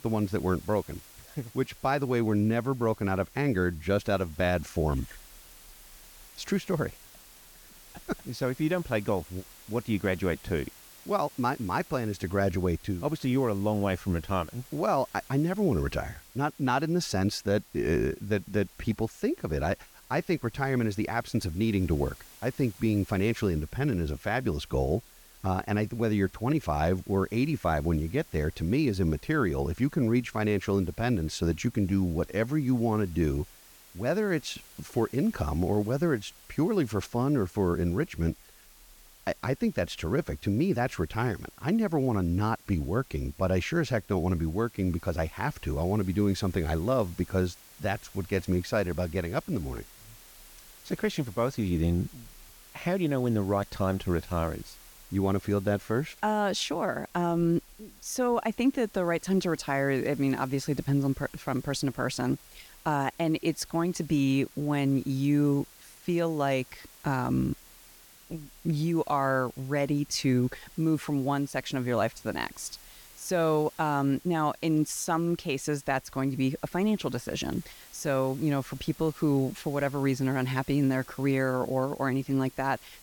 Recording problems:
hiss; faint; throughout; 20 dB below the speech

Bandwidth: 18 kHz